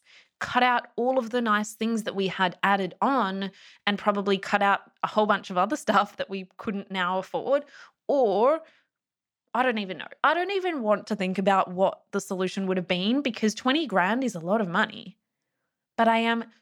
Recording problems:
none

